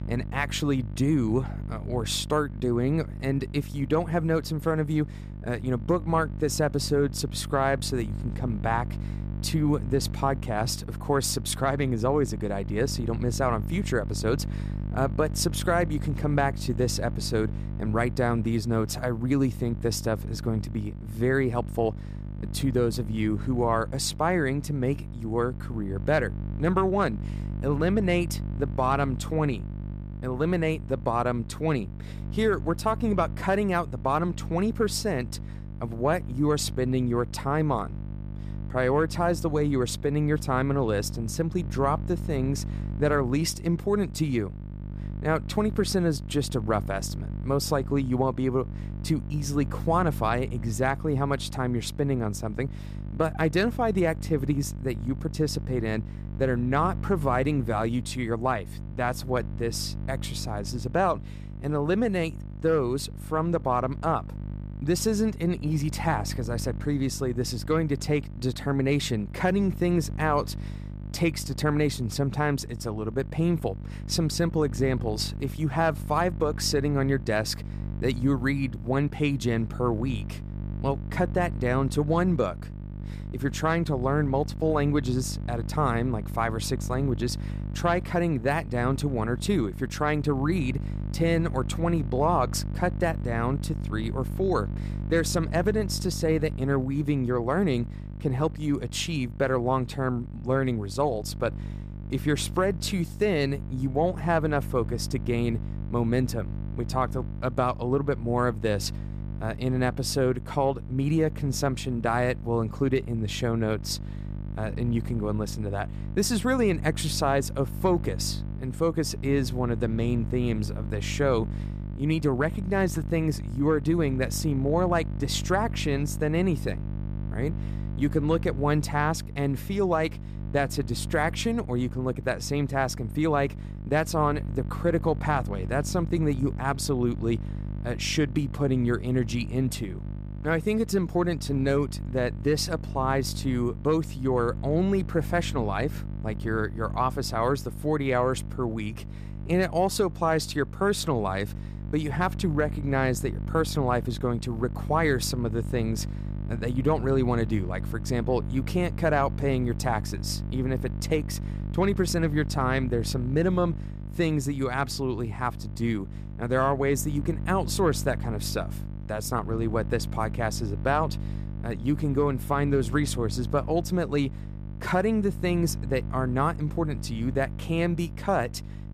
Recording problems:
electrical hum; noticeable; throughout; 50 Hz, 15 dB below the speech

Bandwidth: 14.5 kHz